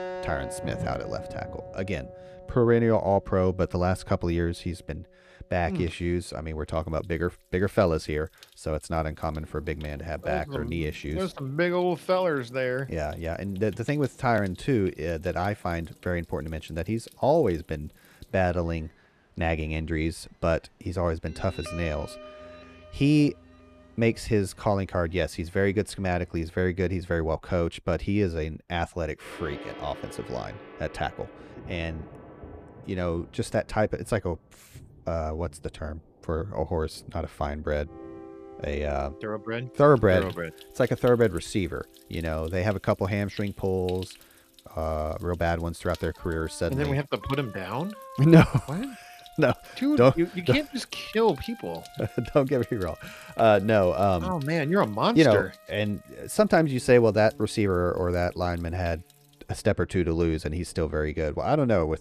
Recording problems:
background music; faint; throughout; 20 dB below the speech
rain or running water; faint; throughout; 25 dB below the speech

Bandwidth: 14.5 kHz